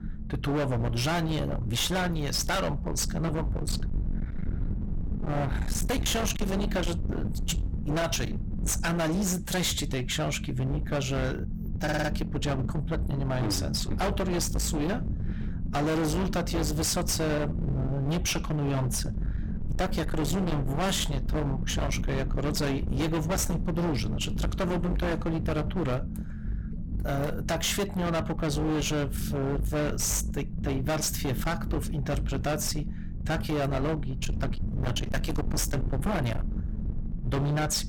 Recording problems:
distortion; heavy; 34% of the sound clipped
low rumble; noticeable; throughout; 10 dB below the speech
audio stuttering; at 12 s

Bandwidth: 17 kHz